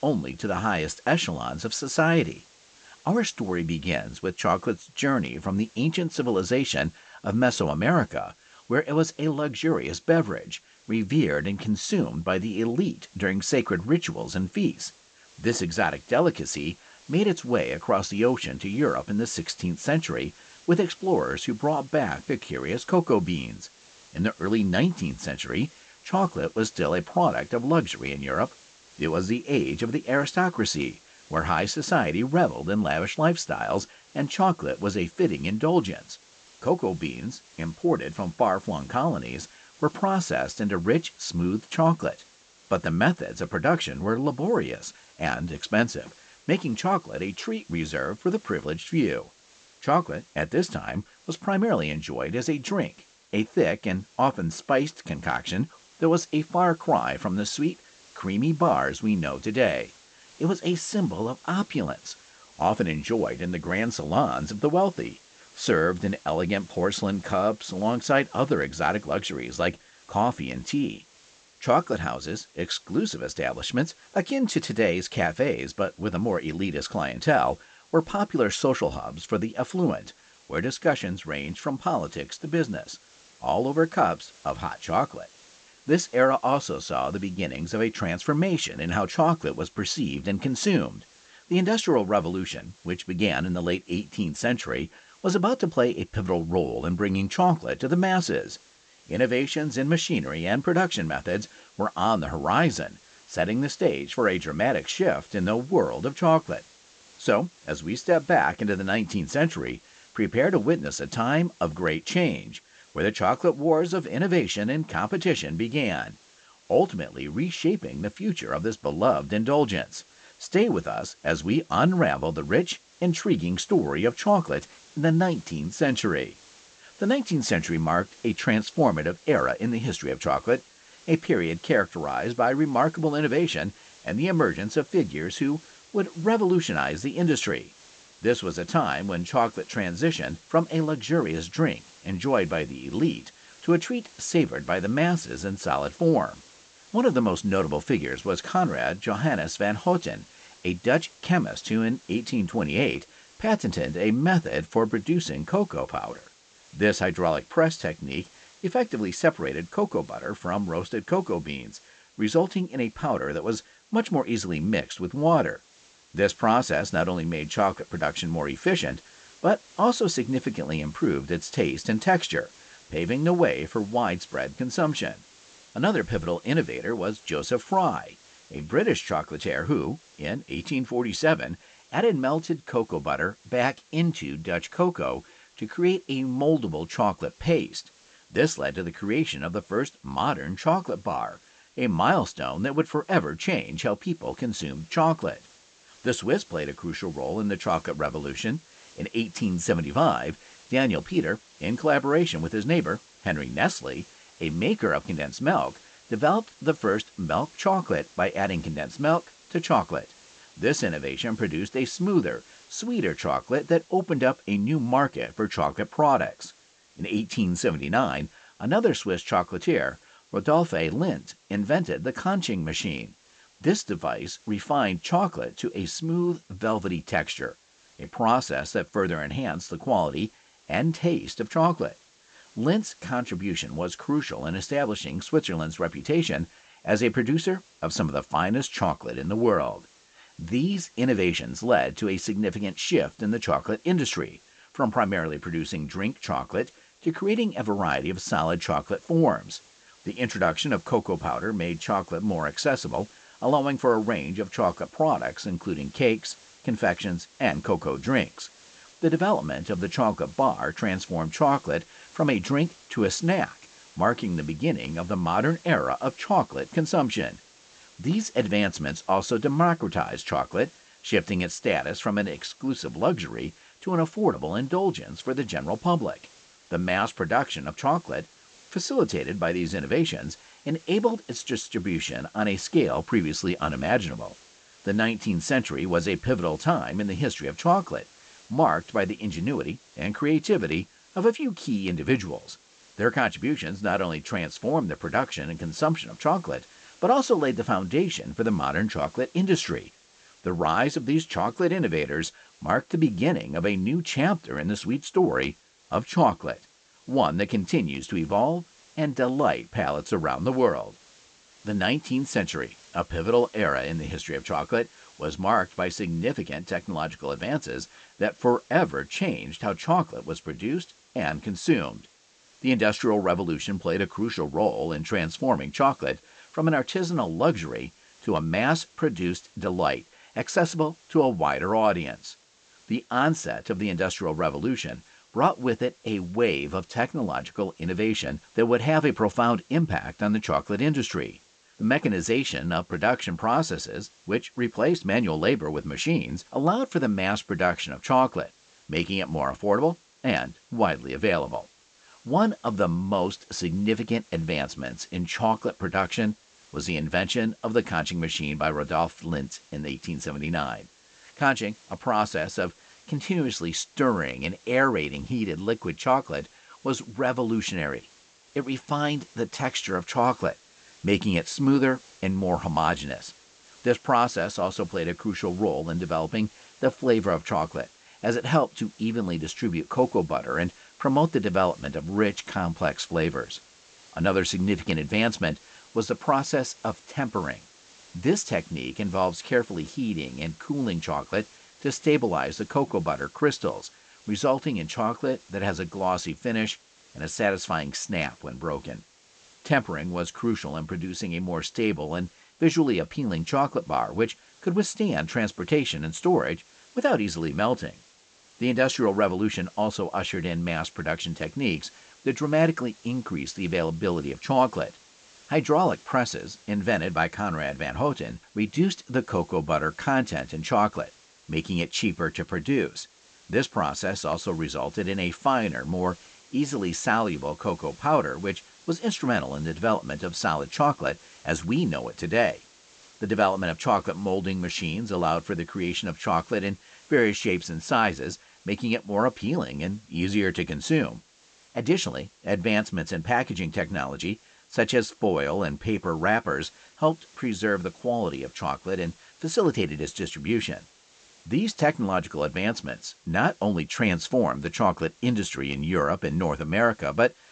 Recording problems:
high frequencies cut off; noticeable; nothing above 8 kHz
hiss; faint; throughout; 25 dB below the speech

